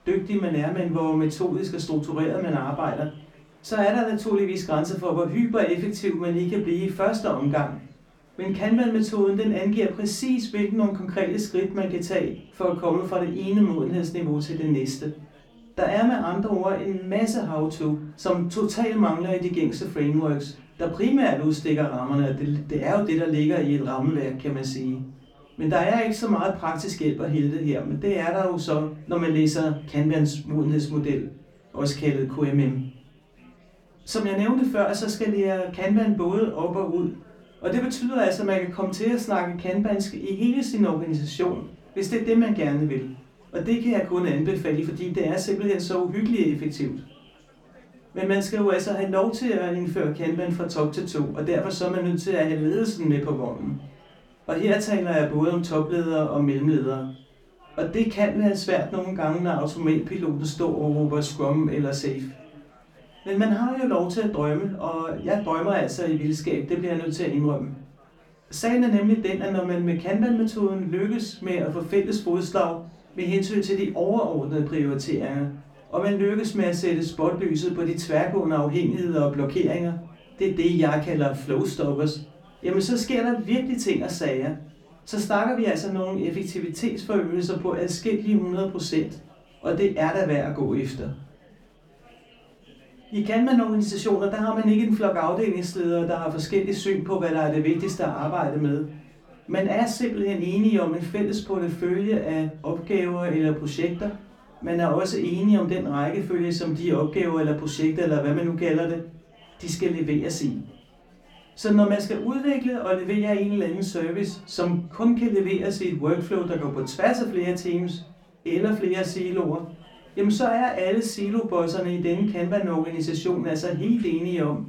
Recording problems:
off-mic speech; far
room echo; very slight; dies away in 0.3 s
chatter from many people; faint; throughout; 30 dB below the speech

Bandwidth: 18 kHz